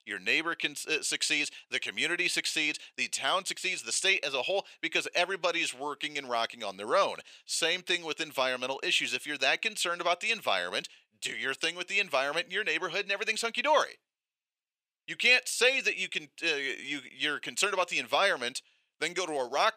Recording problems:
thin; very; fading below 700 Hz

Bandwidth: 15 kHz